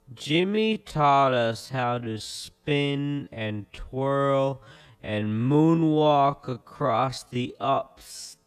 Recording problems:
wrong speed, natural pitch; too slow; 0.5 times normal speed

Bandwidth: 14.5 kHz